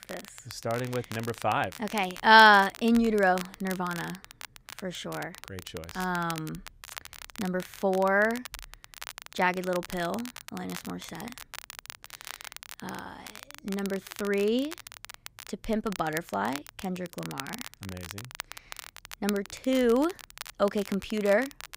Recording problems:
crackle, like an old record; noticeable; 15 dB below the speech

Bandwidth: 15.5 kHz